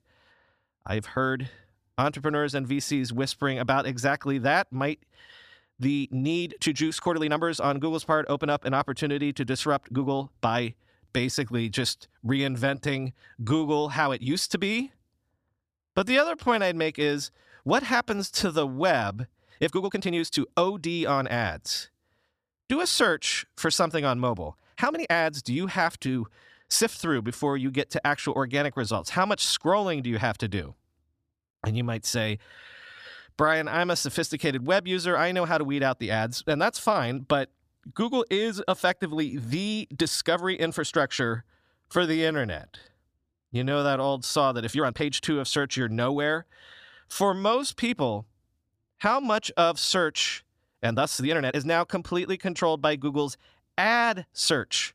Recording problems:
uneven, jittery; strongly; from 1 to 52 s

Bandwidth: 14.5 kHz